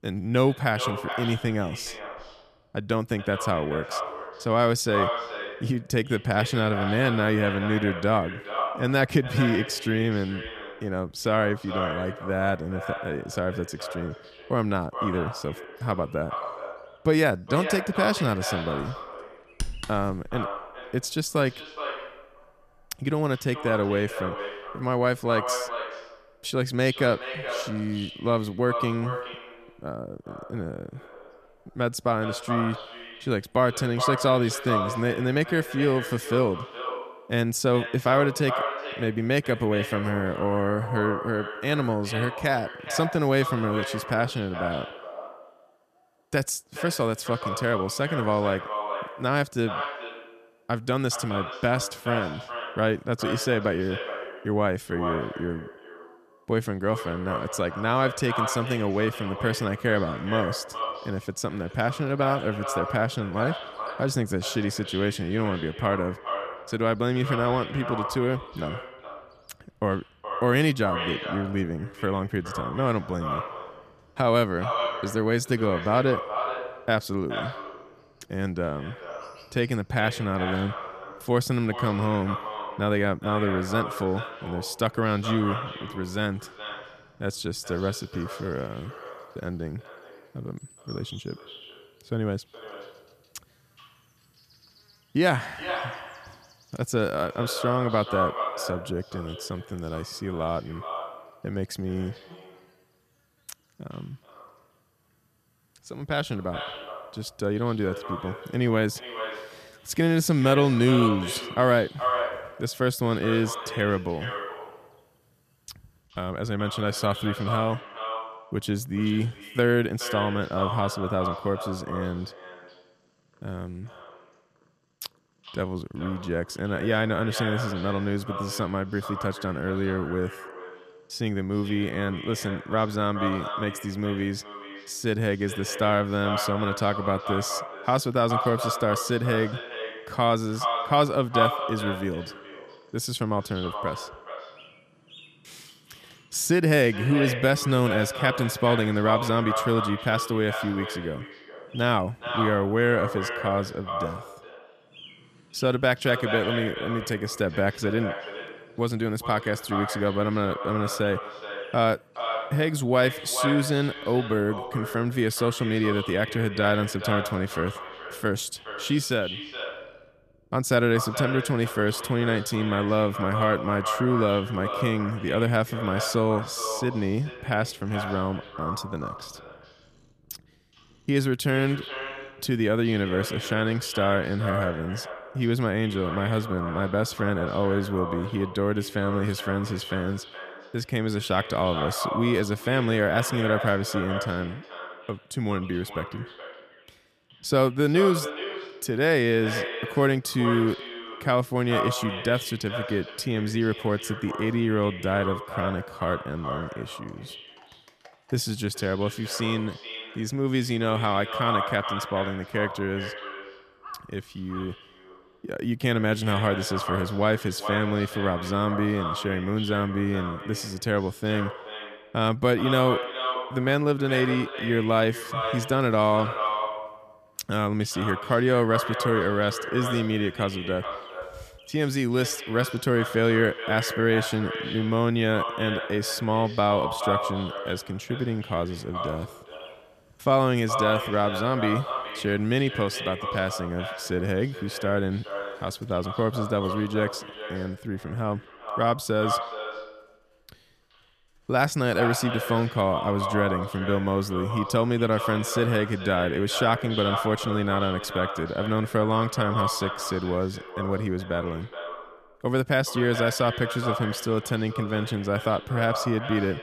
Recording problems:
echo of what is said; strong; throughout; 420 ms later, 7 dB below the speech
animal sounds; faint; throughout; 30 dB below the speech

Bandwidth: 14.5 kHz